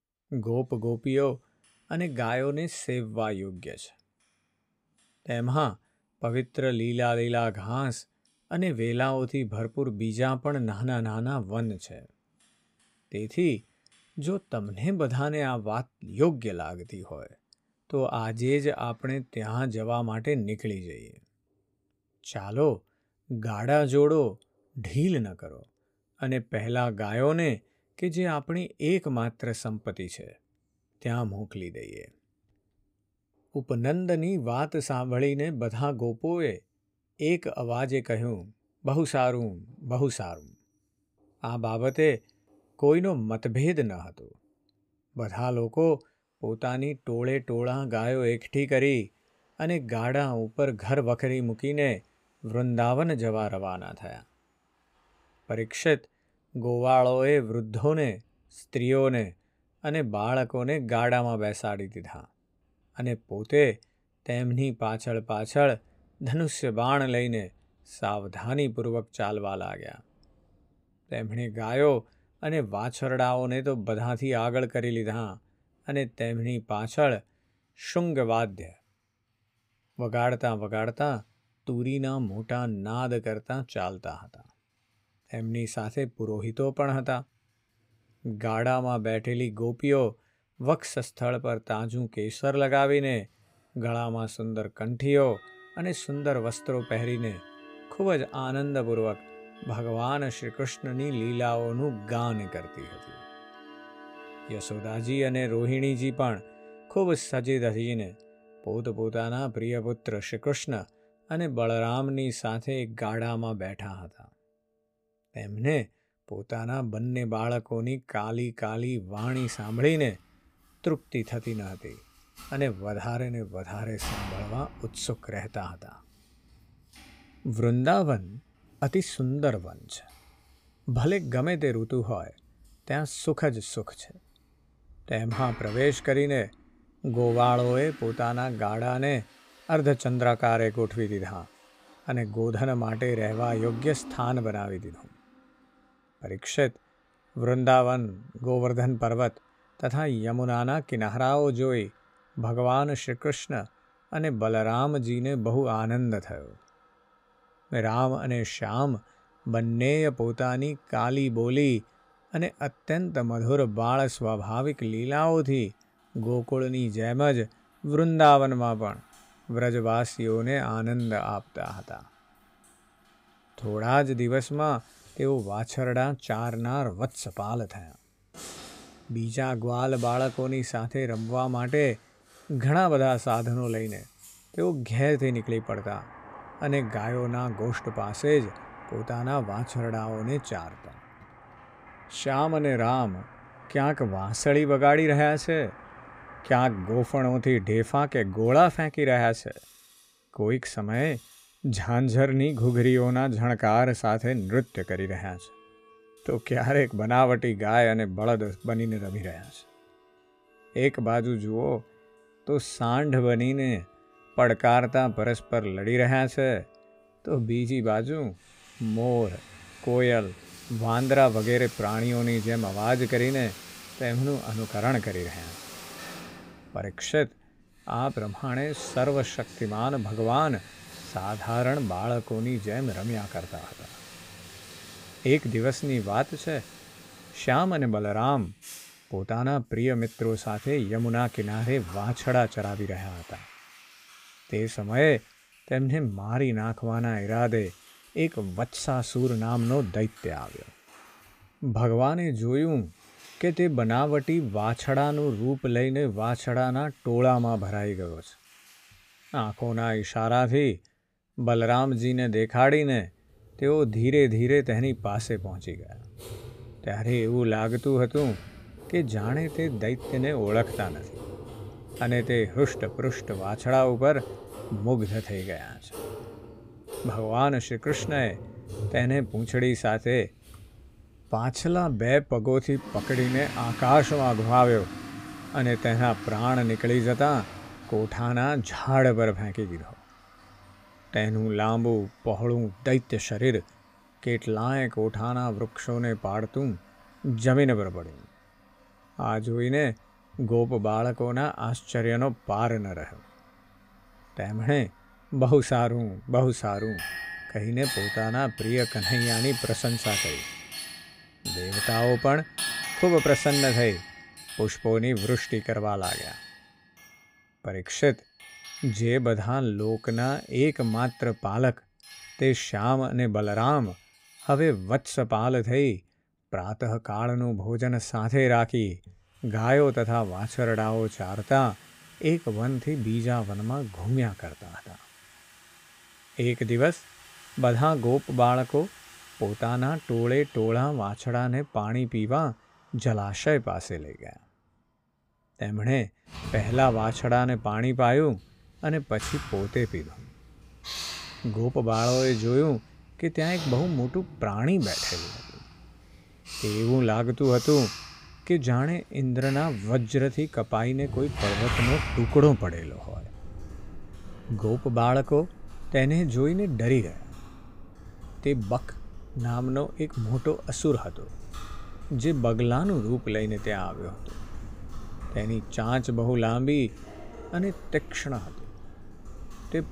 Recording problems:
household noises; noticeable; throughout; 15 dB below the speech

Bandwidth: 15.5 kHz